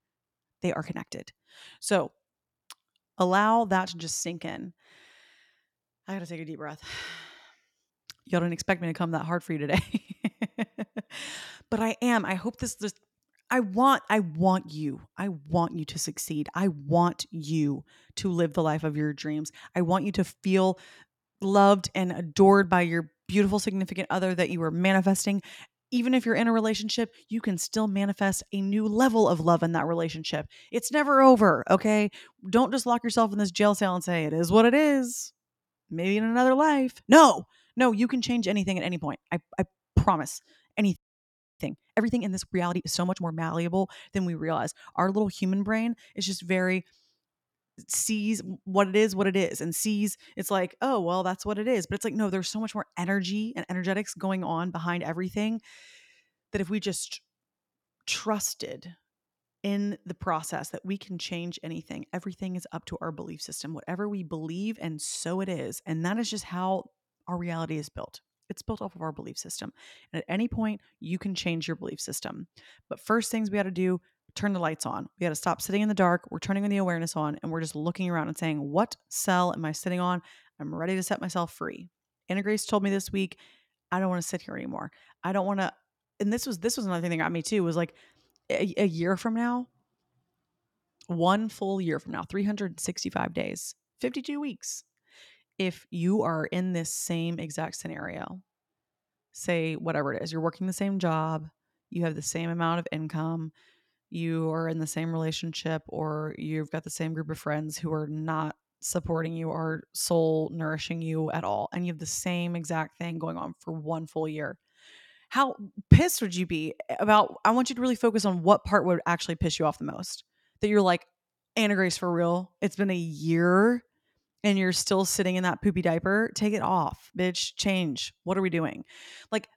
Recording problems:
audio freezing; at 41 s for 0.5 s

